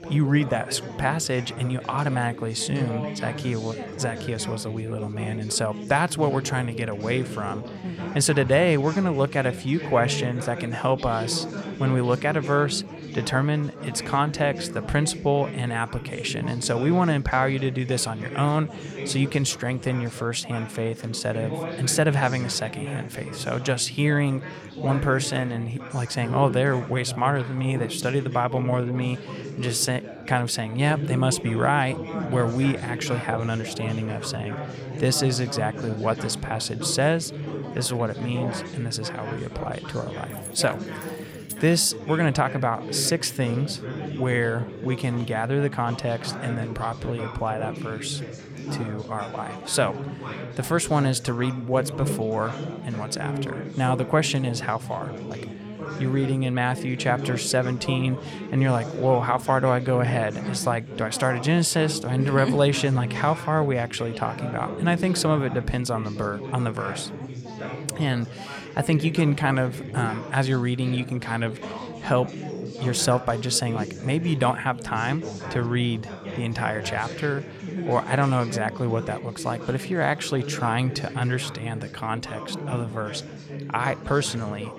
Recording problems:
chatter from many people; loud; throughout; 9 dB below the speech
jangling keys; faint; from 40 to 42 s; peak 10 dB below the speech

